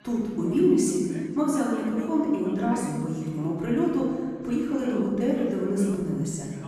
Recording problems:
room echo; strong; dies away in 1.9 s
off-mic speech; far
background chatter; faint; throughout; 2 voices, 20 dB below the speech

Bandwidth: 14.5 kHz